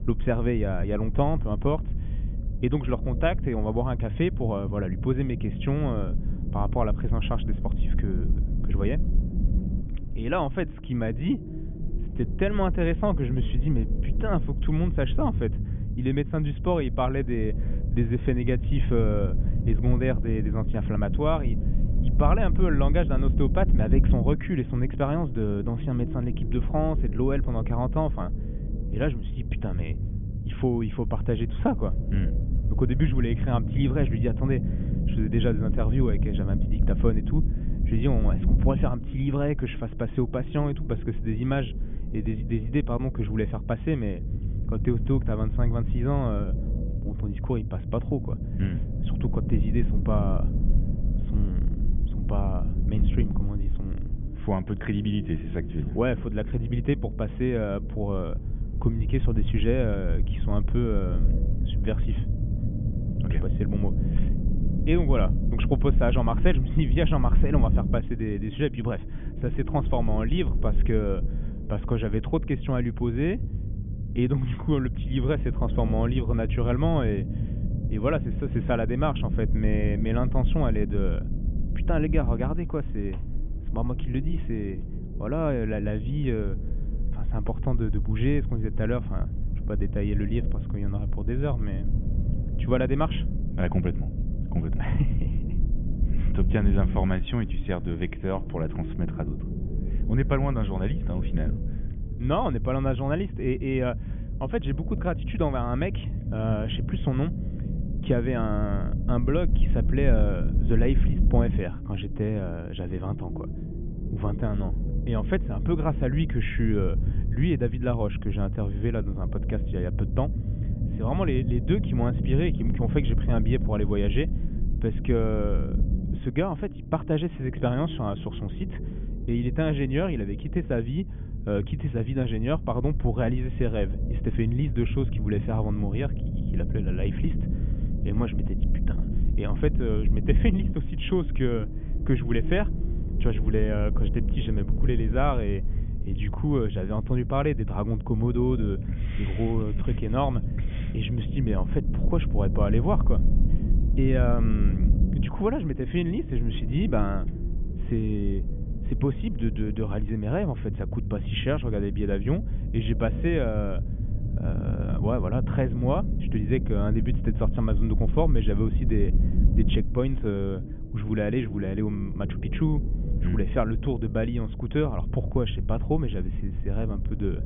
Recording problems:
high frequencies cut off; severe; nothing above 3.5 kHz
low rumble; noticeable; throughout; 10 dB below the speech

